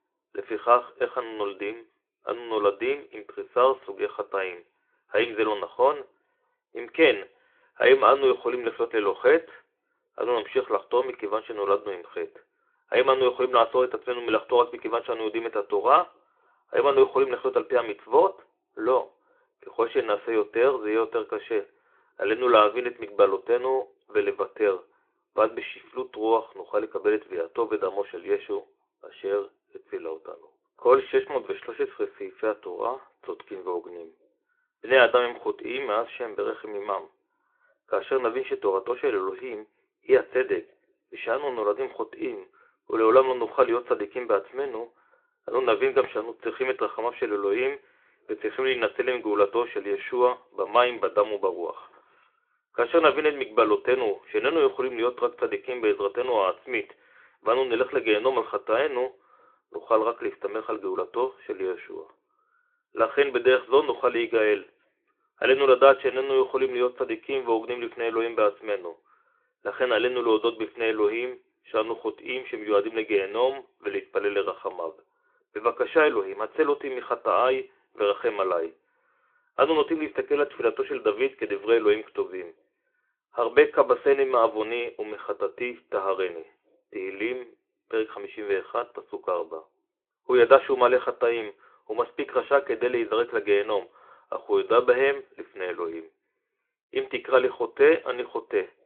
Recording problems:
phone-call audio; nothing above 3.5 kHz

